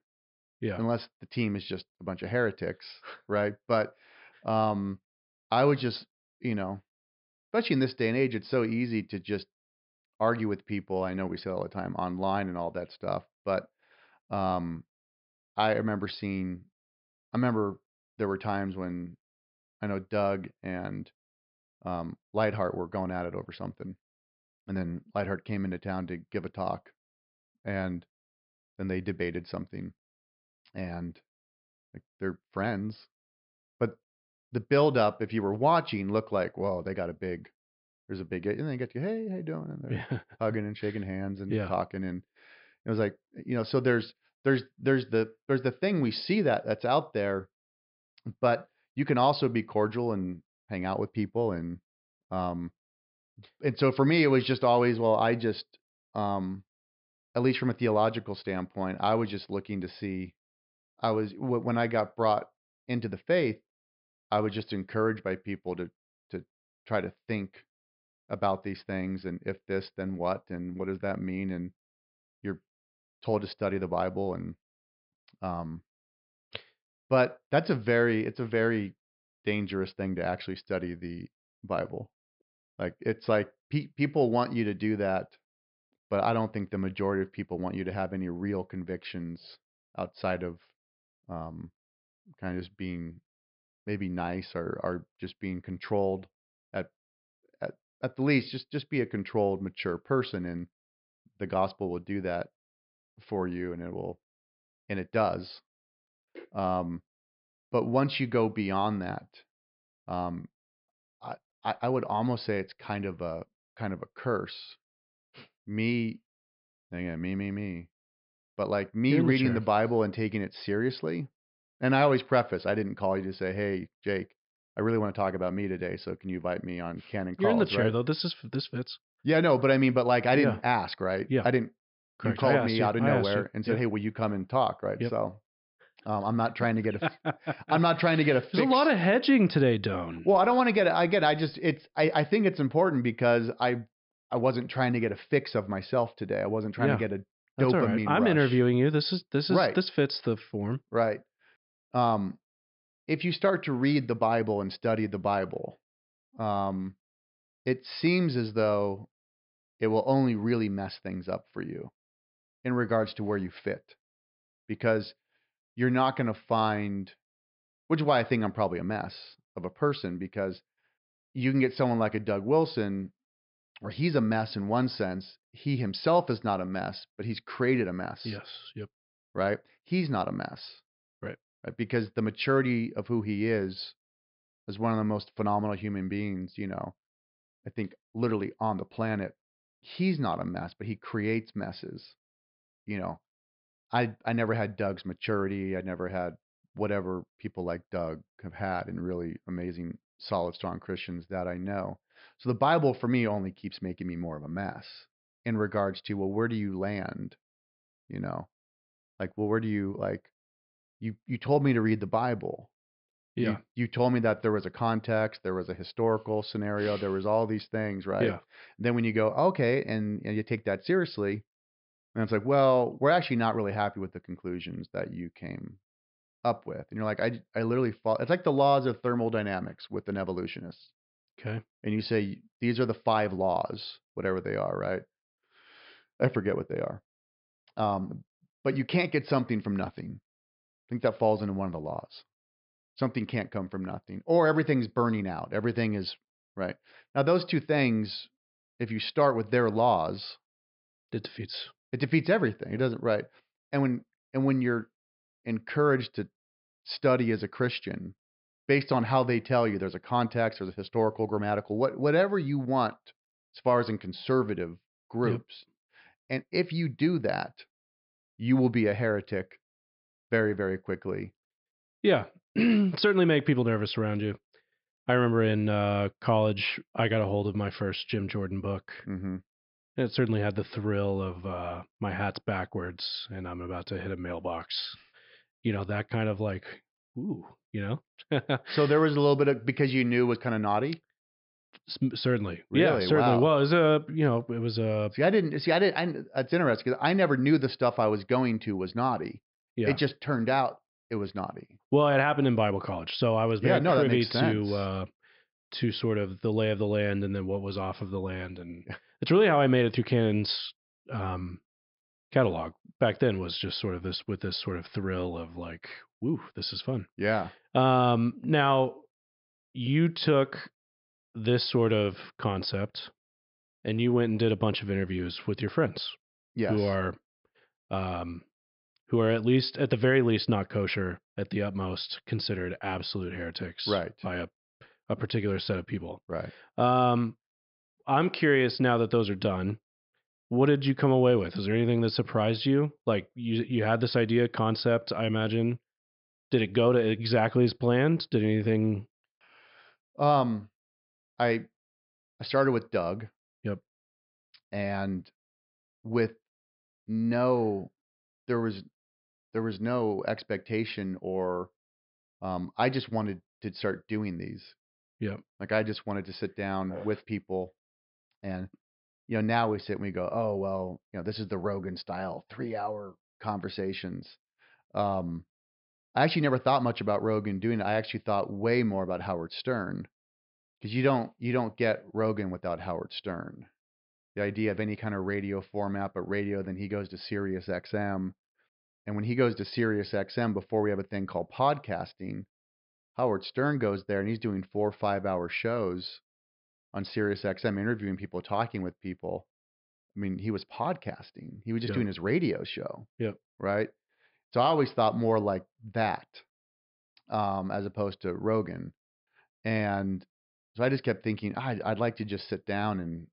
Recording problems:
high frequencies cut off; noticeable; nothing above 5.5 kHz

